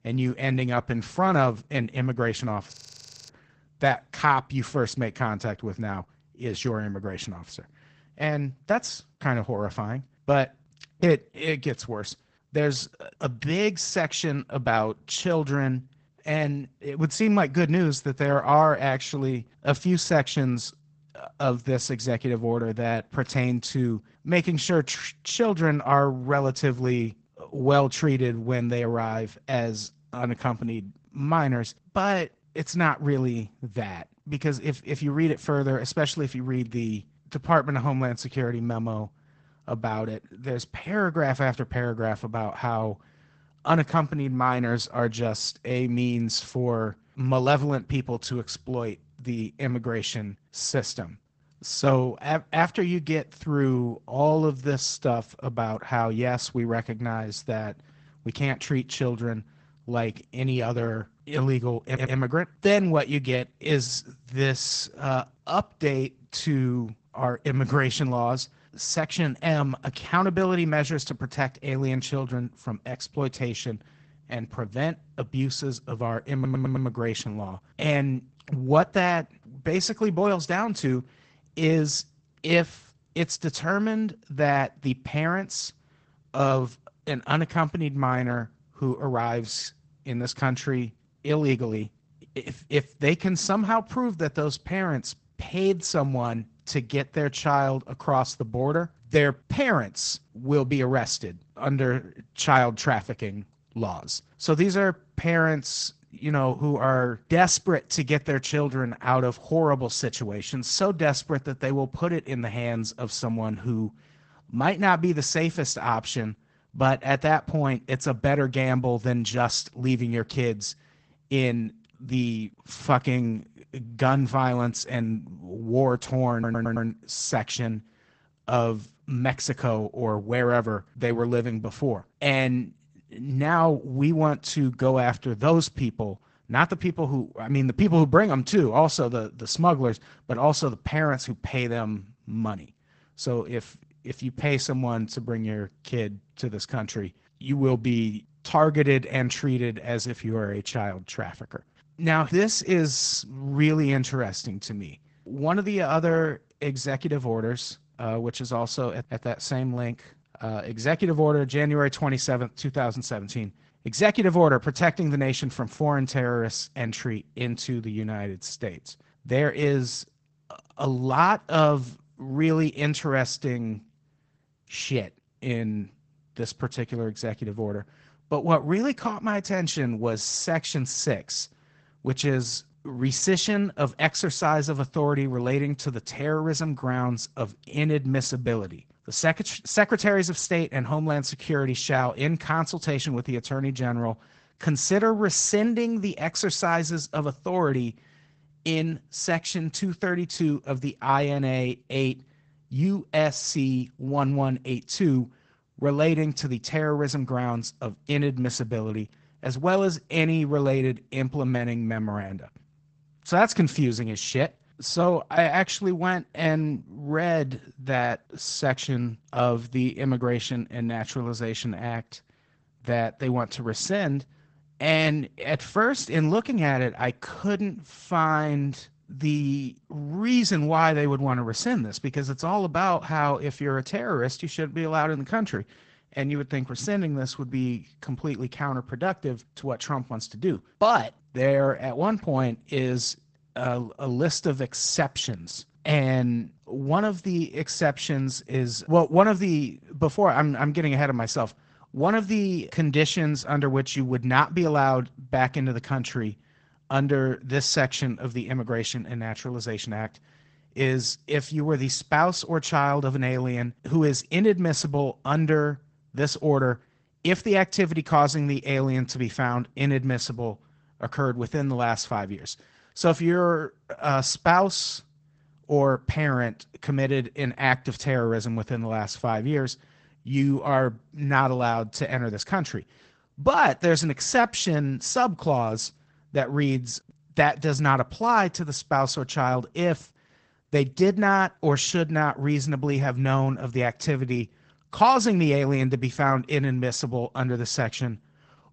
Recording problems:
garbled, watery; badly; nothing above 8 kHz
audio freezing; at 2.5 s for 0.5 s
audio stuttering; at 1:02, at 1:16 and at 2:06

